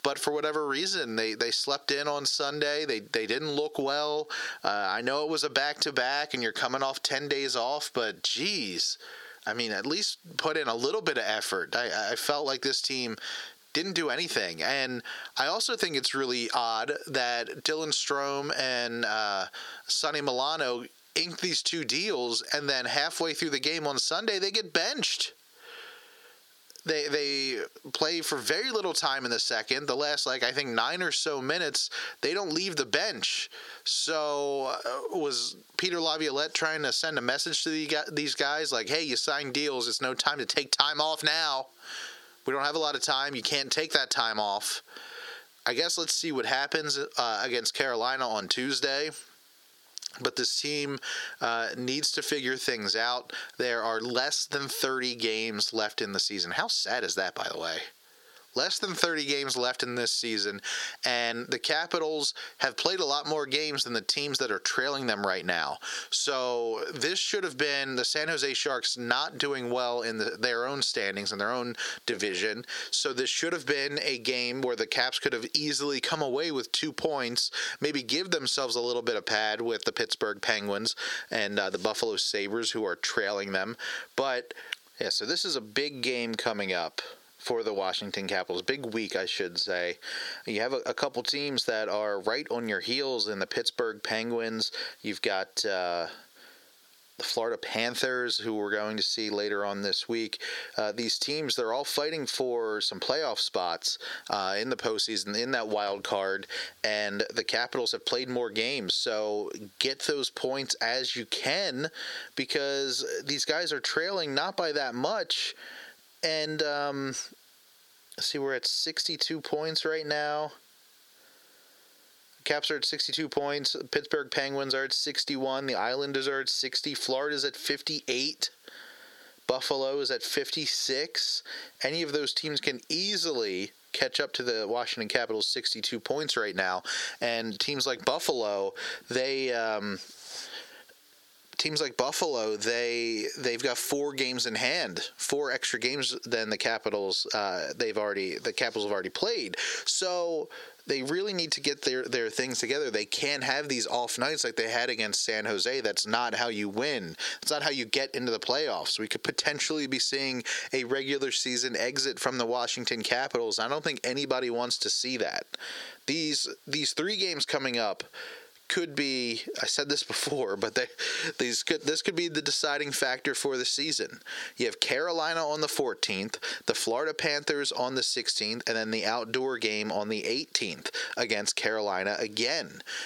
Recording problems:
squashed, flat; heavily
thin; very slightly; fading below 450 Hz

